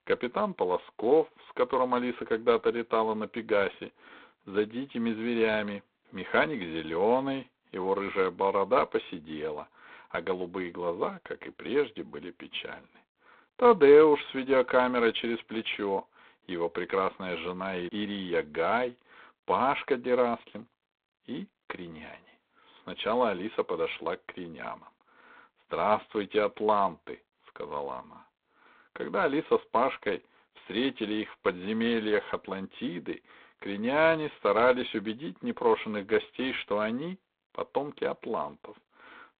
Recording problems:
phone-call audio; poor line; nothing above 3.5 kHz

